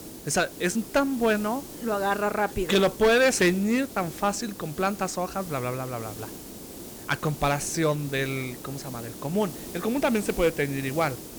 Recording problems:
distortion; slight; 3% of the sound clipped
hiss; noticeable; throughout; 15 dB below the speech

